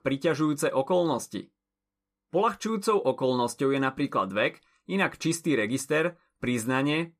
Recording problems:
none

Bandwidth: 14.5 kHz